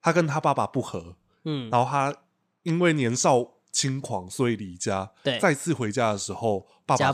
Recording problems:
abrupt cut into speech; at the end

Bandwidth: 14.5 kHz